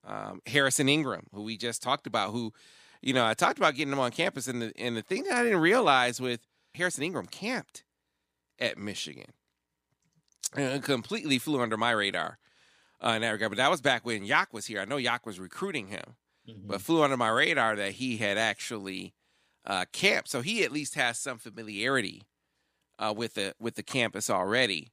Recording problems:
none

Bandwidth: 15 kHz